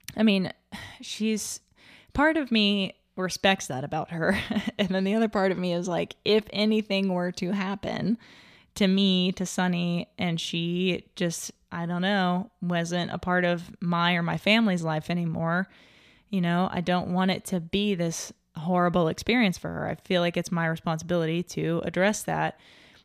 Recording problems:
none

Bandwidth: 14.5 kHz